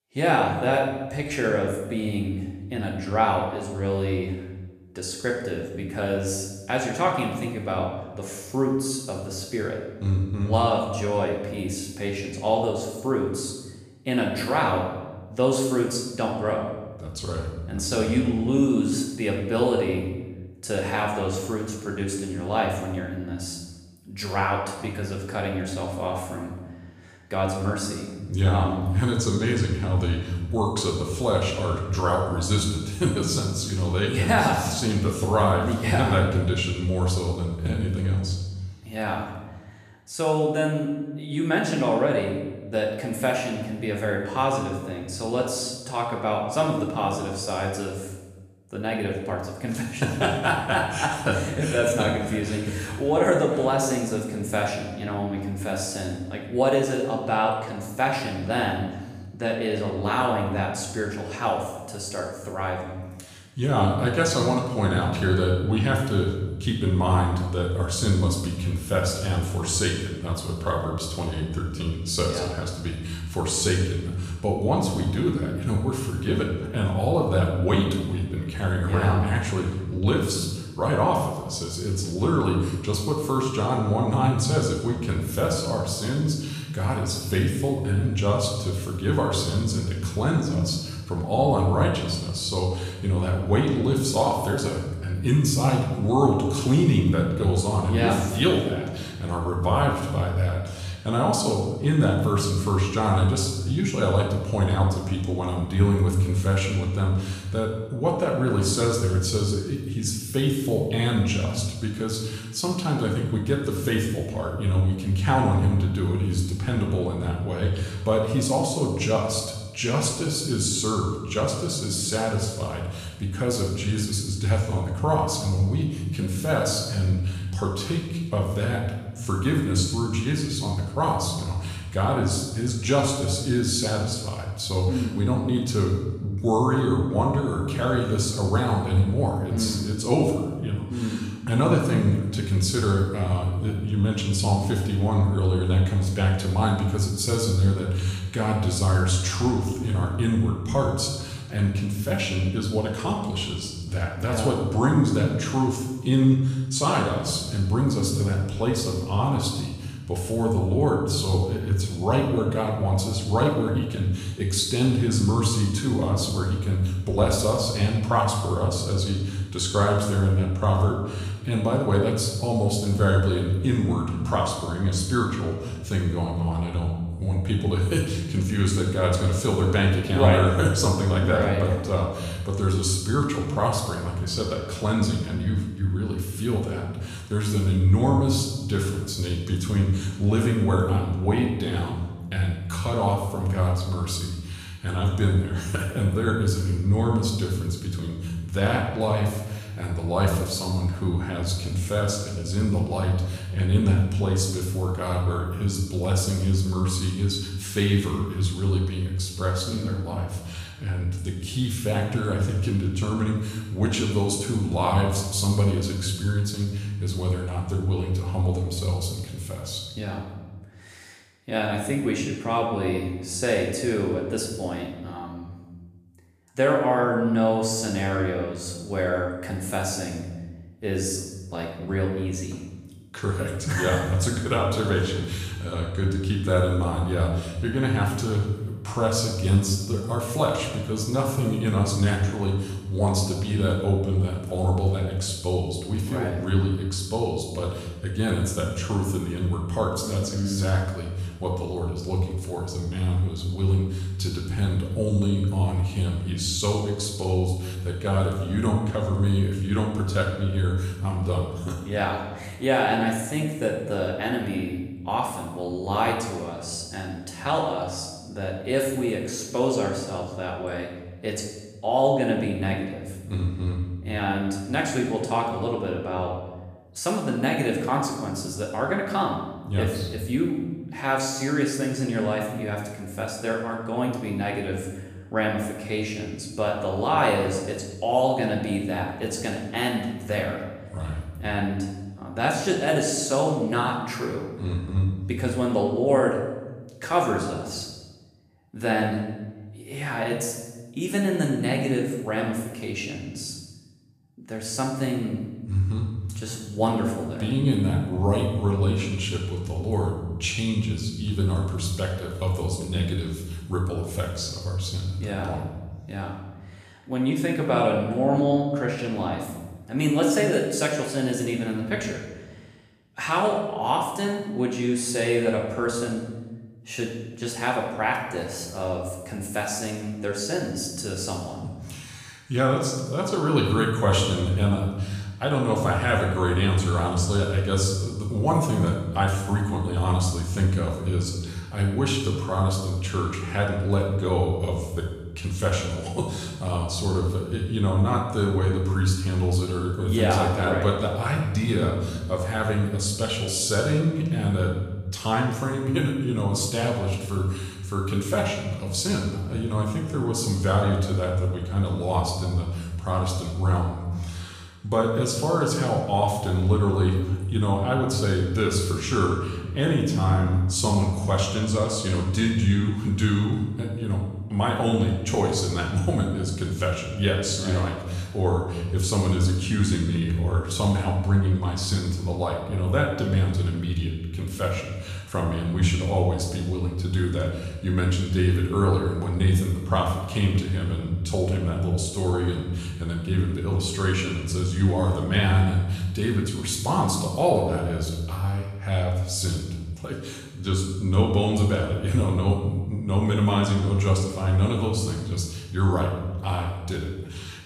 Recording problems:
off-mic speech; far
room echo; noticeable; dies away in 1 s

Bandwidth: 14.5 kHz